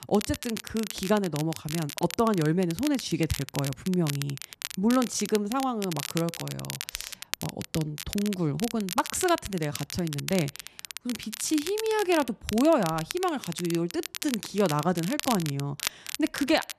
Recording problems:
crackle, like an old record; loud; 8 dB below the speech

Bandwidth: 13.5 kHz